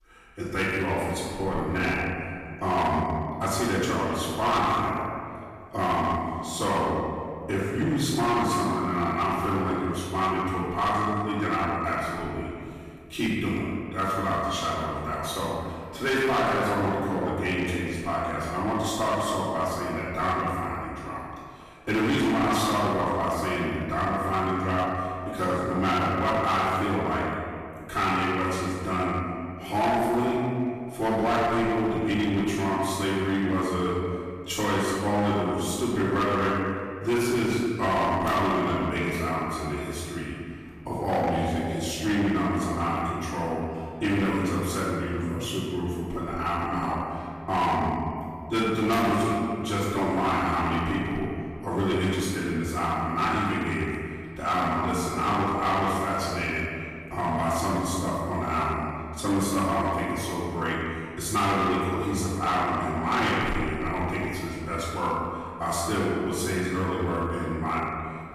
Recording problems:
room echo; strong; dies away in 2 s
off-mic speech; far
distortion; slight; 10% of the sound clipped

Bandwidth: 15 kHz